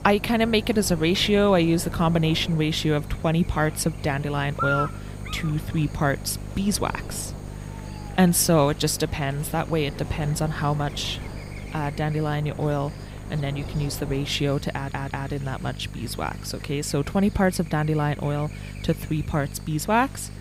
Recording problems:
electrical hum; noticeable; throughout; 50 Hz, 15 dB below the speech
wind noise on the microphone; occasional gusts; until 14 s; 20 dB below the speech
murmuring crowd; faint; throughout; 25 dB below the speech
audio stuttering; at 15 s

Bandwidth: 15.5 kHz